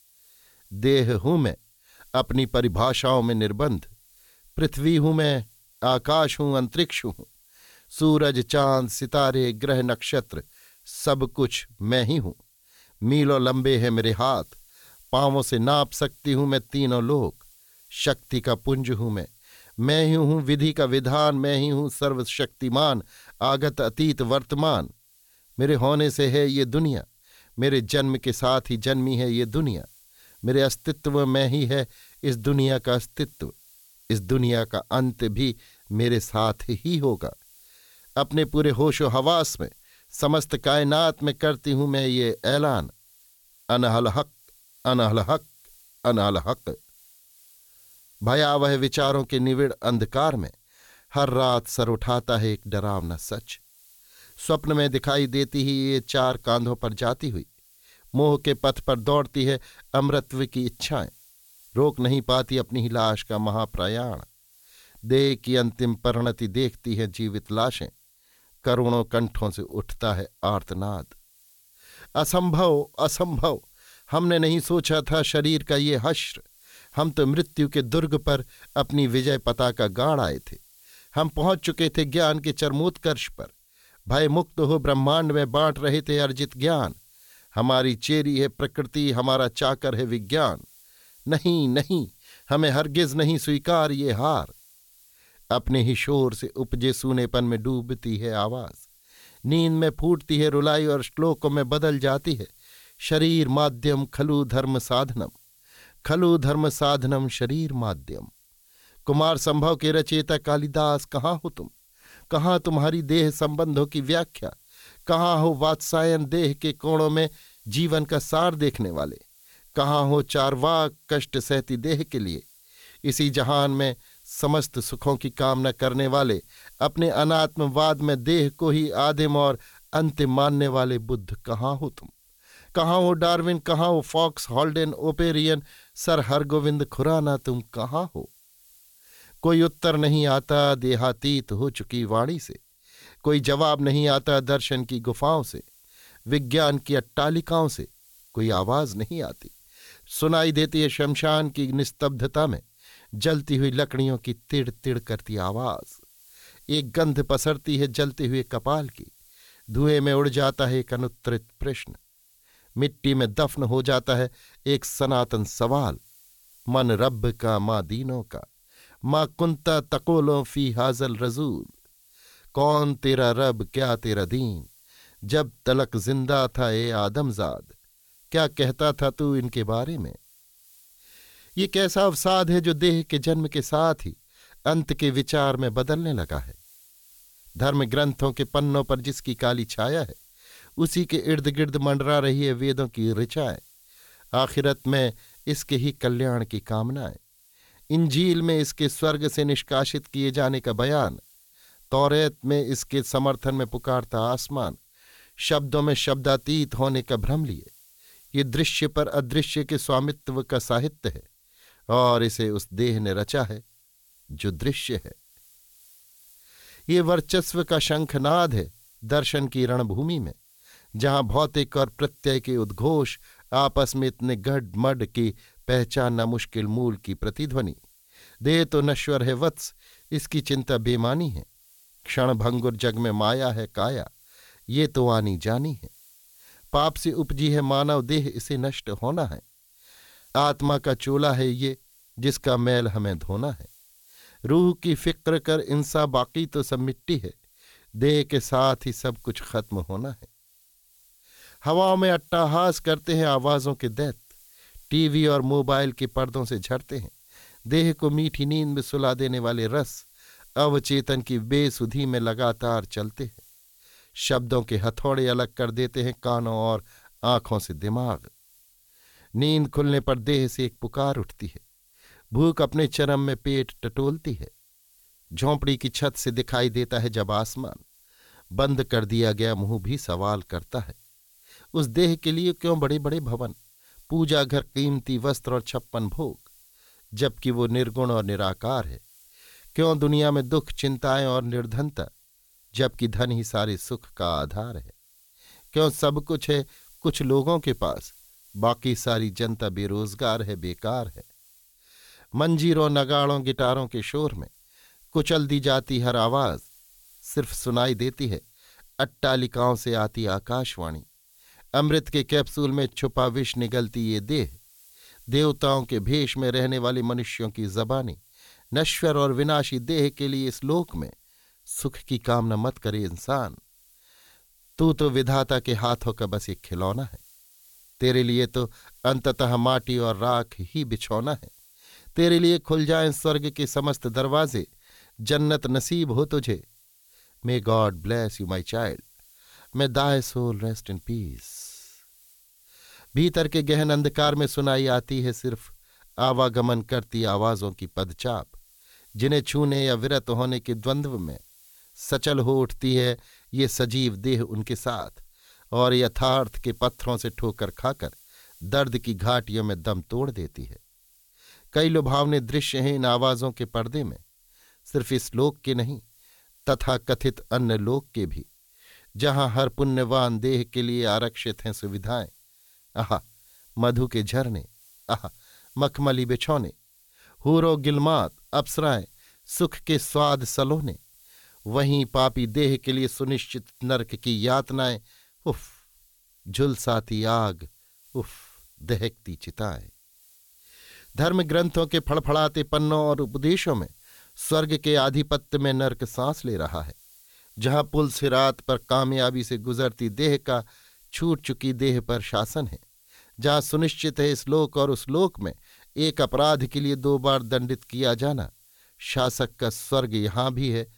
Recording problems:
hiss; faint; throughout; 30 dB below the speech

